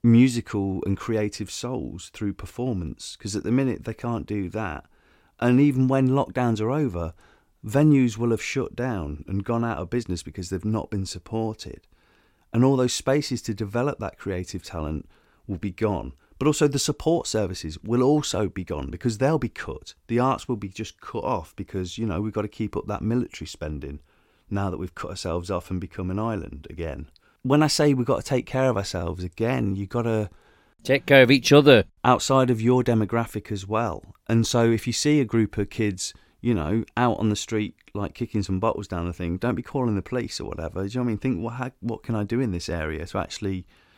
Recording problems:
none

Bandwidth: 16.5 kHz